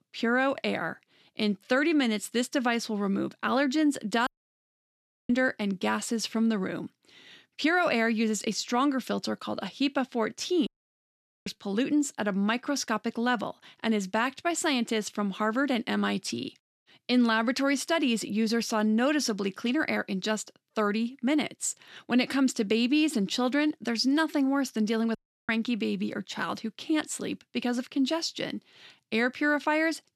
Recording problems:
audio cutting out; at 4.5 s for 1 s, at 11 s for 1 s and at 25 s

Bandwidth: 13.5 kHz